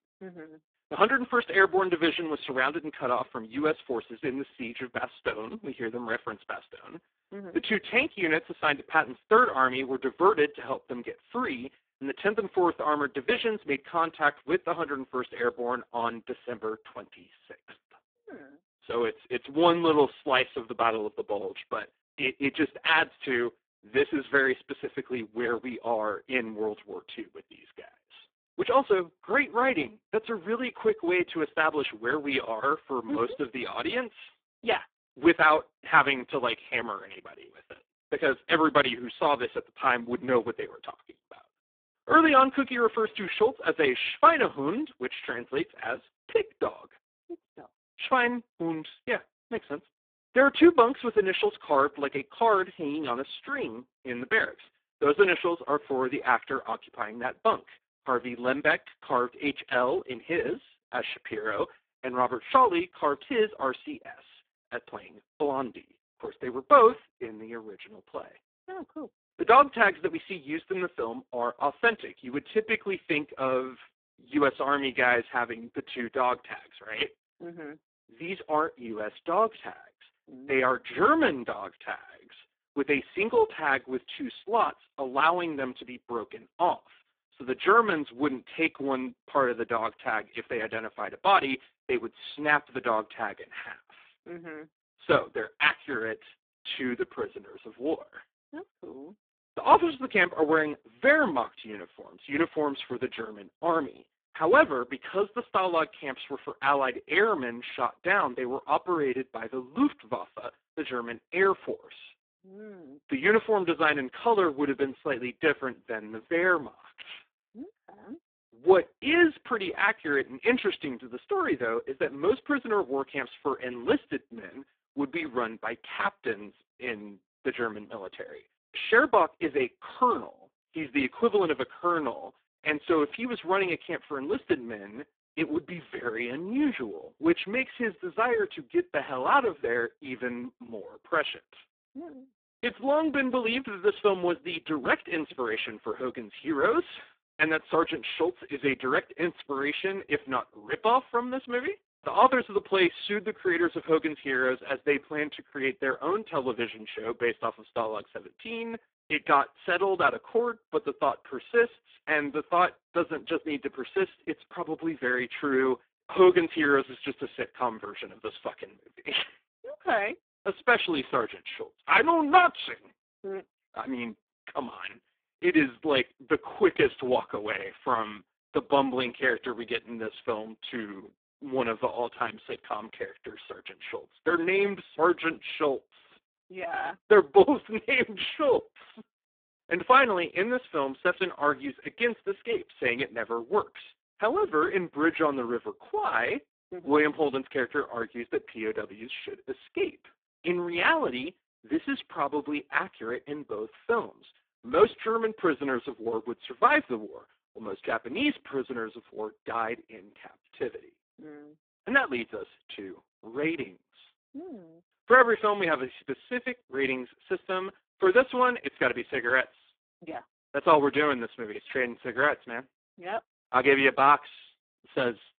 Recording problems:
phone-call audio; poor line

